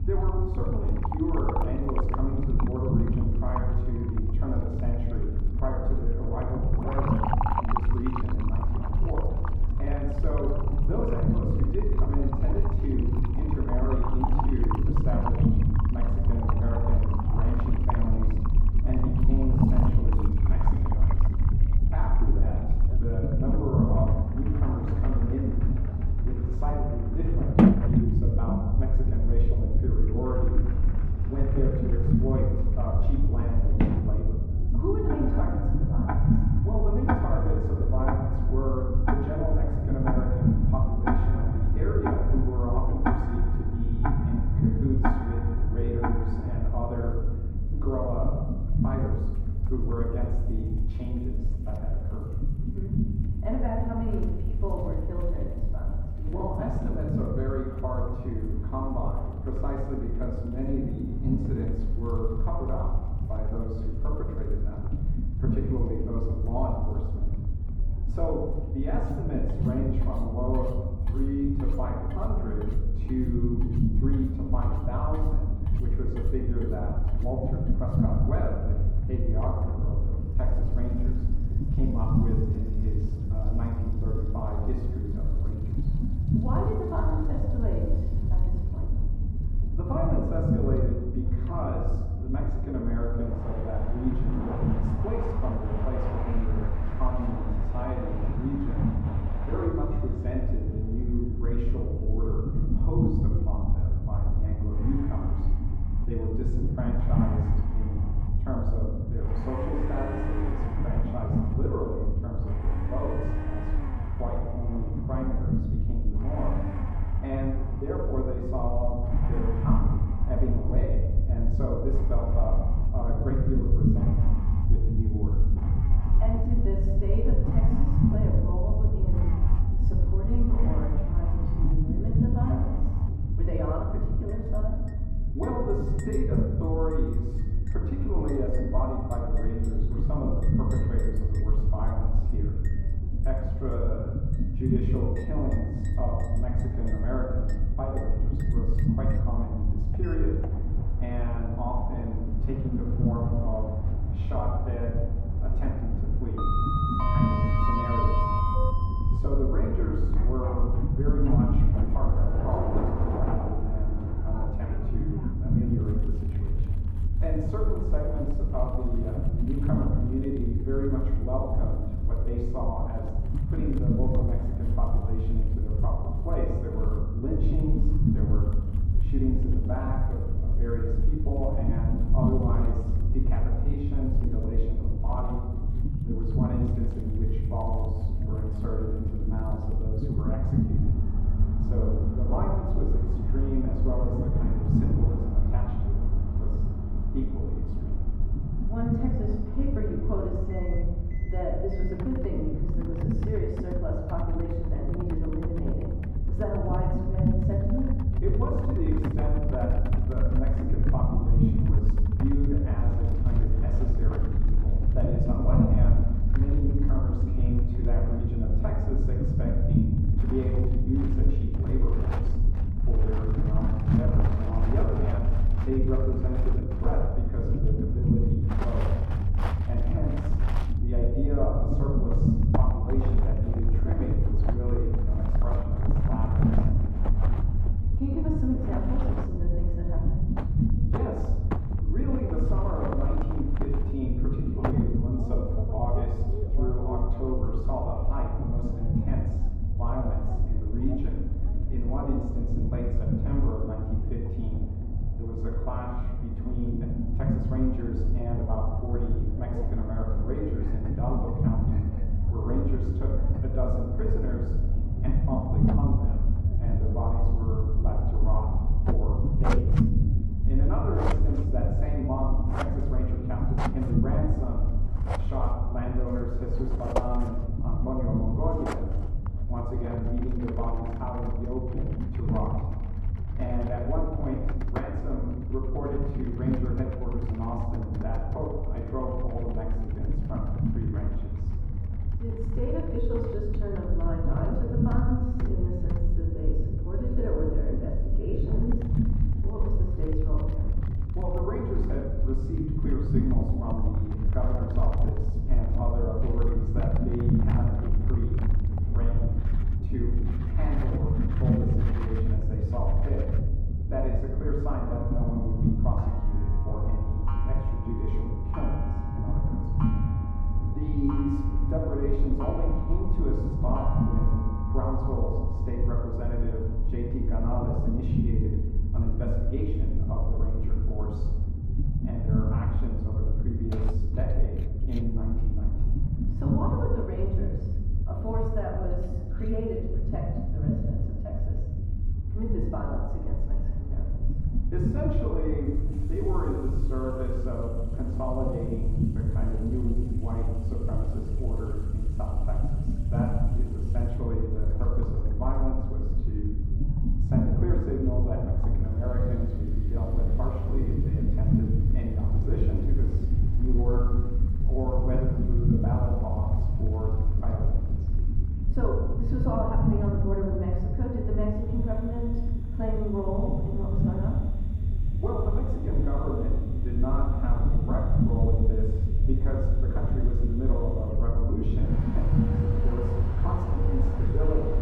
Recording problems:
off-mic speech; far
muffled; very; fading above 2 kHz
room echo; noticeable; dies away in 1.1 s
household noises; loud; throughout; 5 dB below the speech
low rumble; loud; throughout; 5 dB below the speech
chatter from many people; faint; throughout; 25 dB below the speech

